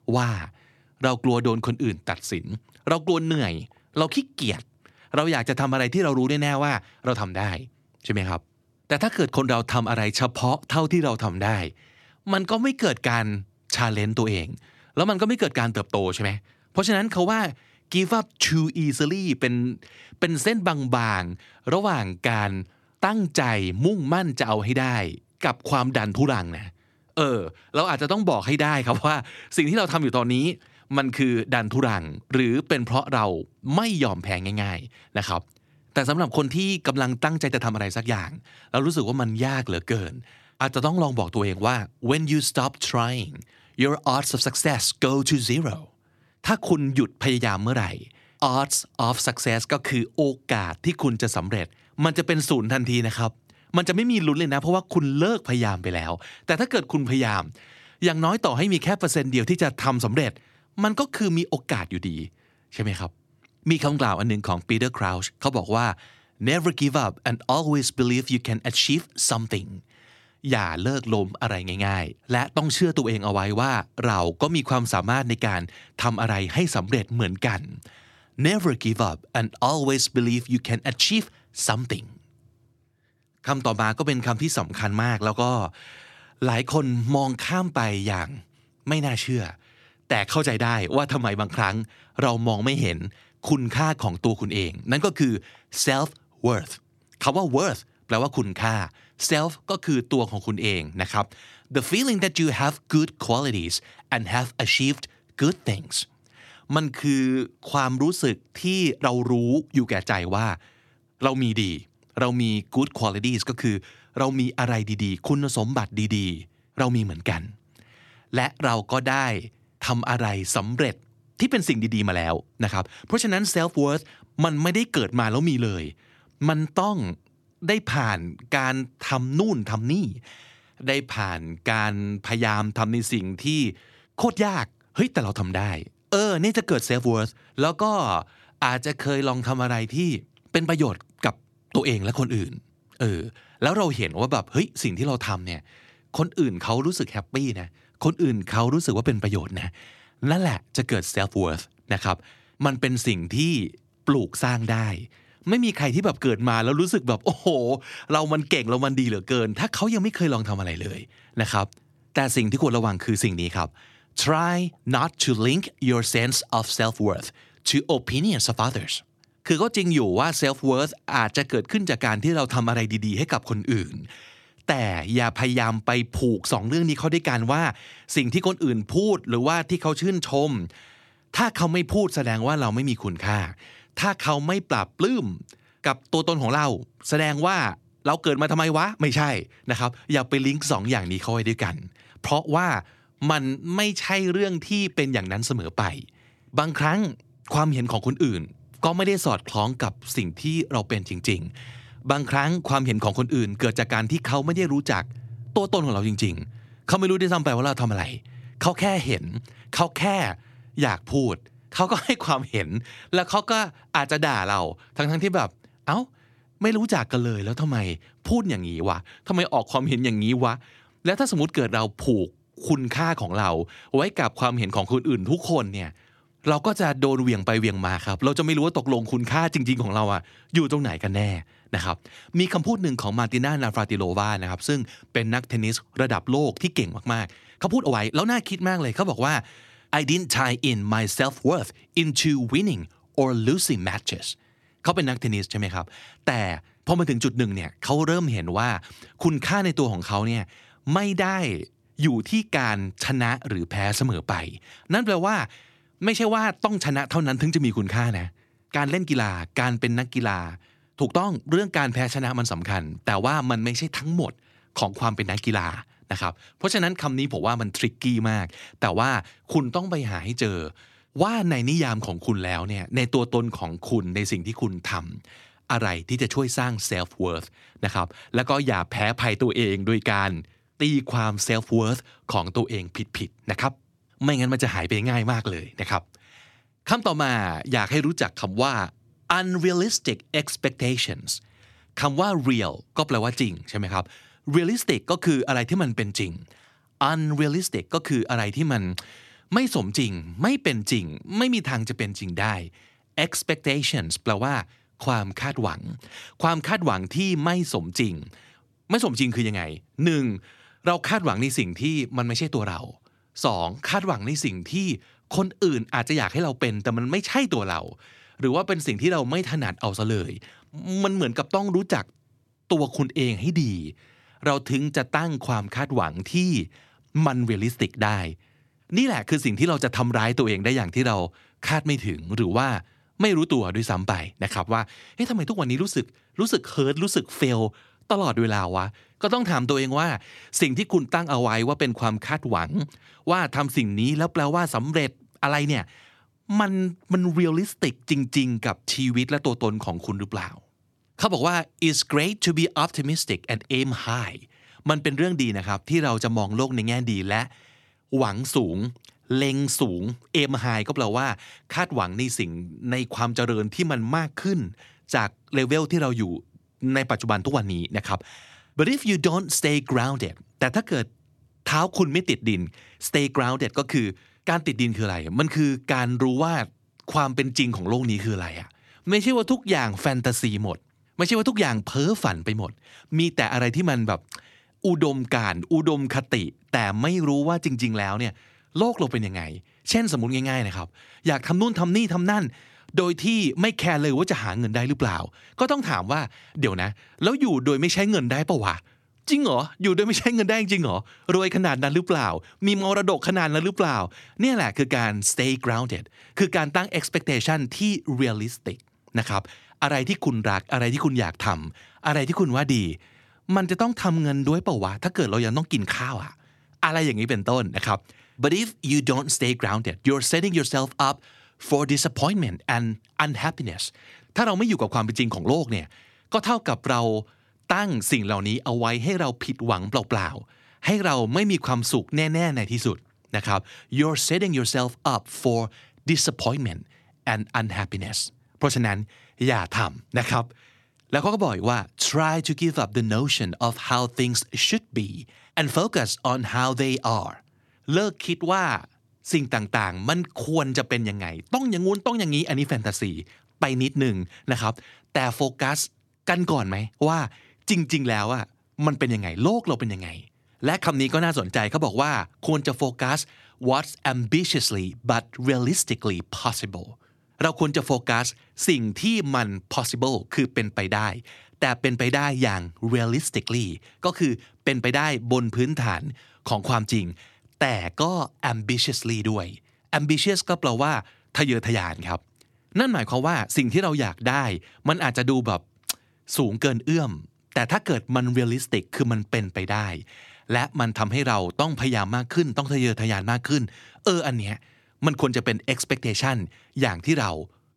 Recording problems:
uneven, jittery; strongly; from 12 s to 6:20

